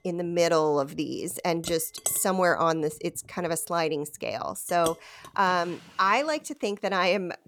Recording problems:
household noises; noticeable; throughout; 10 dB below the speech

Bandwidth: 18 kHz